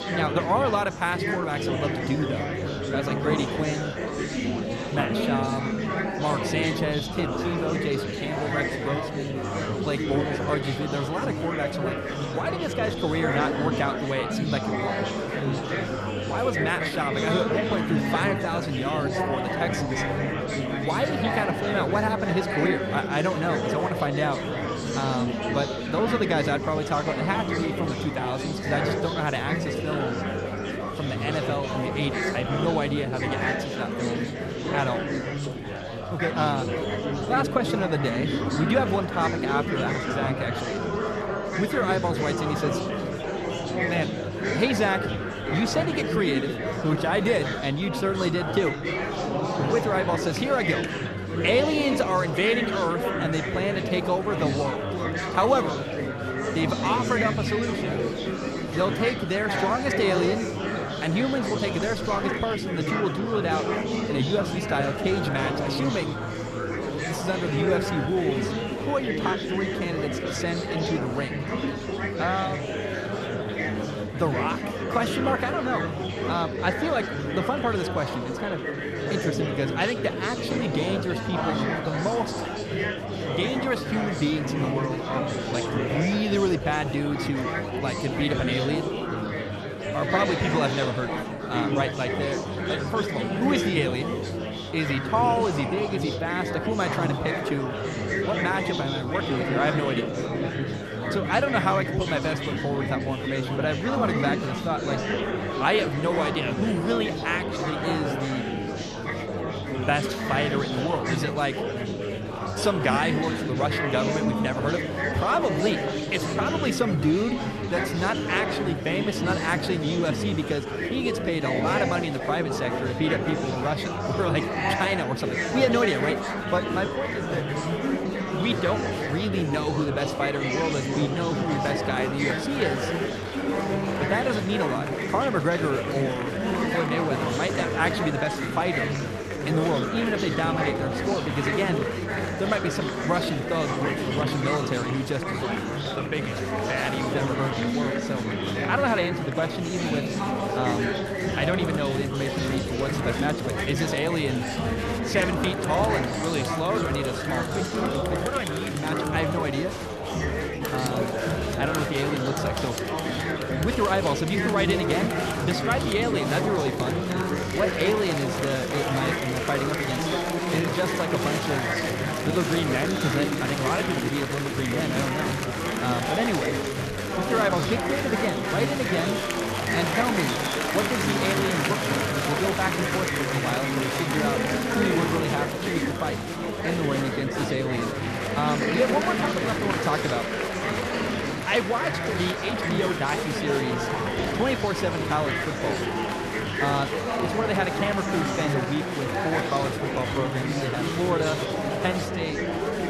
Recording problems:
murmuring crowd; very loud; throughout; as loud as the speech

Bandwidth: 13.5 kHz